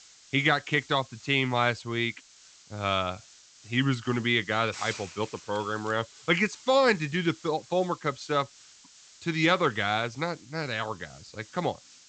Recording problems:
high frequencies cut off; noticeable; nothing above 8 kHz
hiss; faint; throughout; 20 dB below the speech

